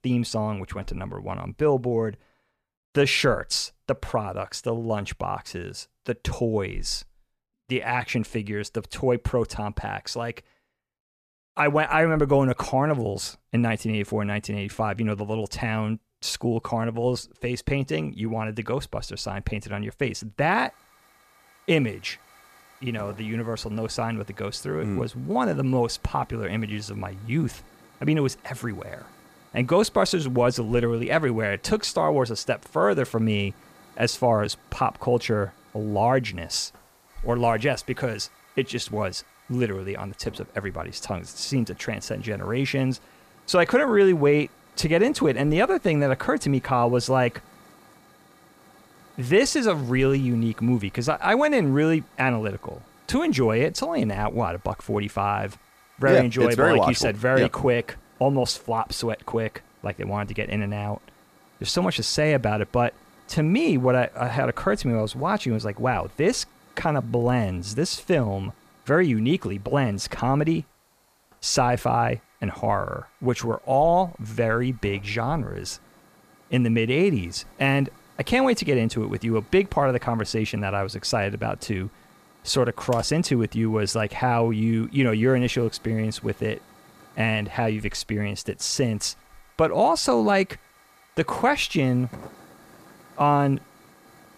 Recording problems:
hiss; faint; from 21 s on; 30 dB below the speech

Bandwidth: 14.5 kHz